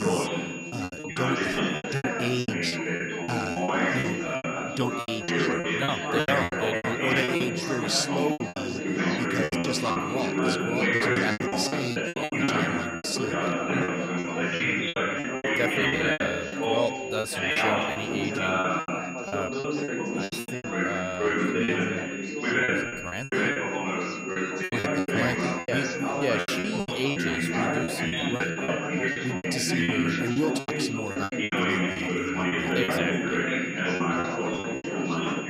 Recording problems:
chatter from many people; very loud; throughout; 5 dB above the speech
high-pitched whine; loud; throughout; 2.5 kHz, 6 dB below the speech
choppy; very; 15% of the speech affected
abrupt cut into speech; at the start

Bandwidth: 15.5 kHz